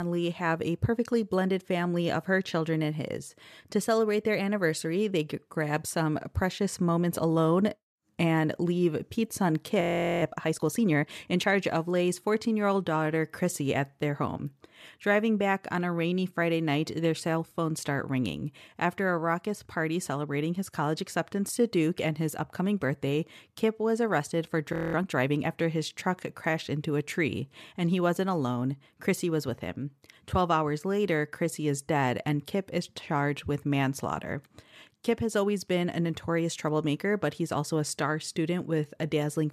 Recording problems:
abrupt cut into speech; at the start
audio freezing; at 10 s and at 25 s

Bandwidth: 14 kHz